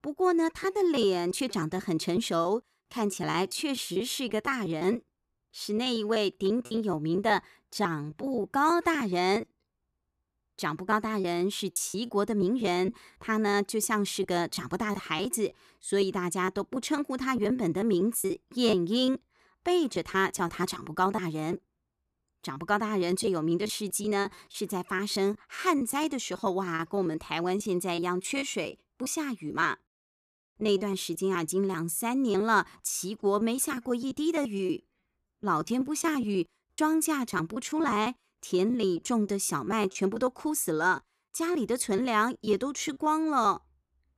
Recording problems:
choppy; very; 10% of the speech affected

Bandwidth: 14 kHz